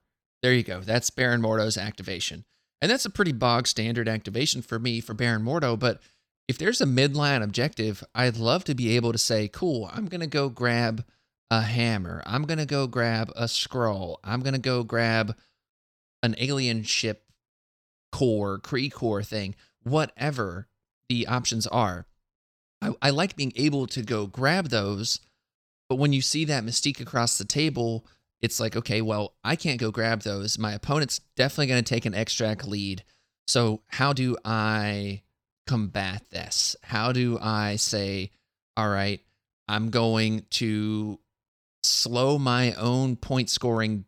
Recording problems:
uneven, jittery; strongly; from 6.5 to 43 s

